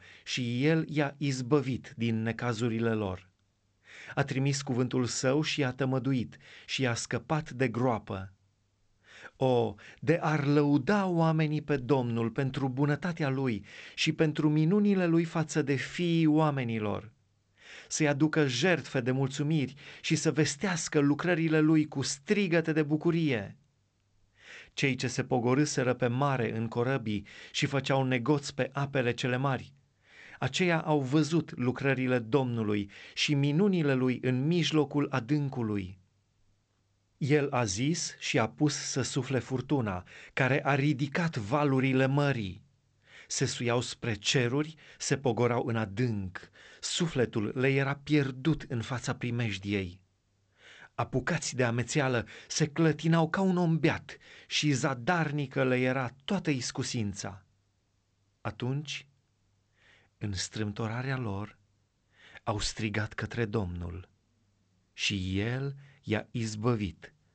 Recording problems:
garbled, watery; slightly; nothing above 8 kHz

